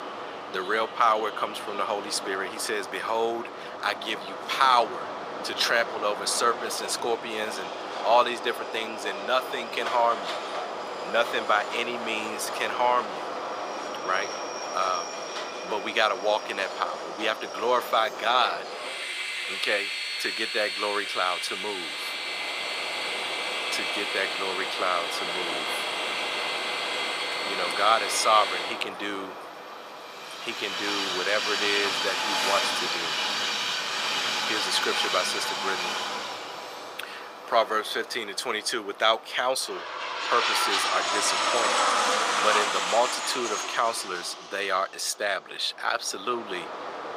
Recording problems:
thin; very; fading below 600 Hz
train or aircraft noise; loud; throughout; 2 dB below the speech

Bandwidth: 15 kHz